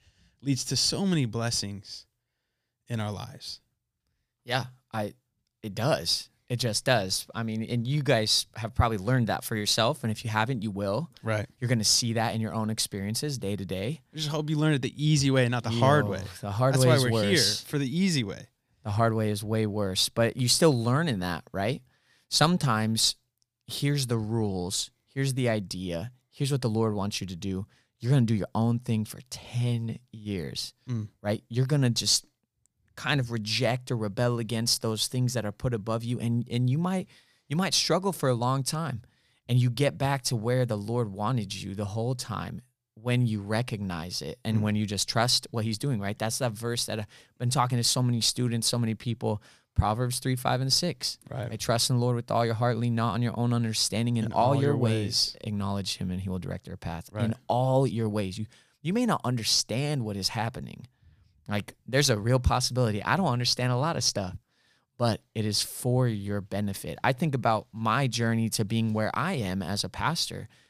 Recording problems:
none

